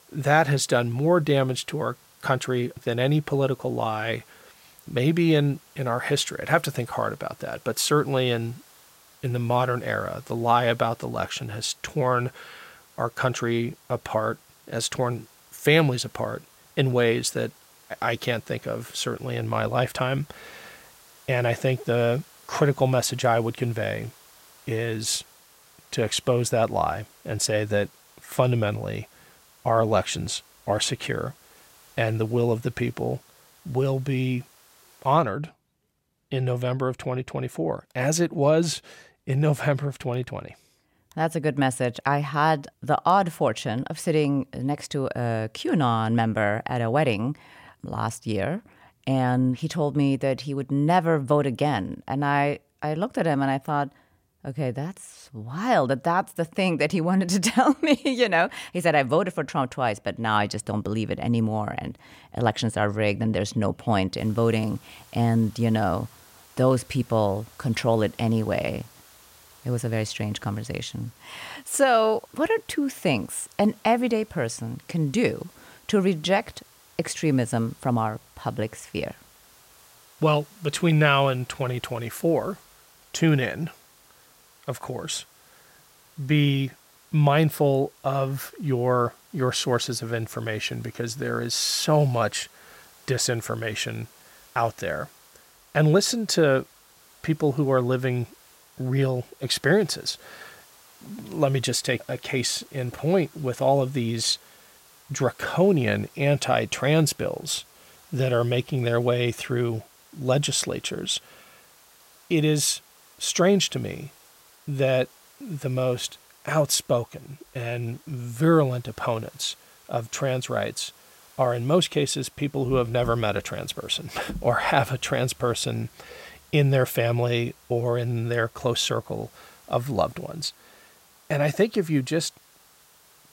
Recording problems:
hiss; faint; until 35 s and from 1:04 on; 25 dB below the speech

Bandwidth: 16 kHz